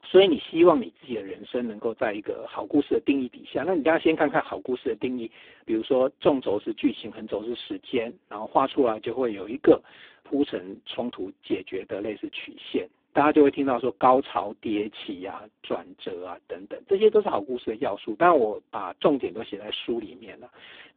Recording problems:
phone-call audio; poor line

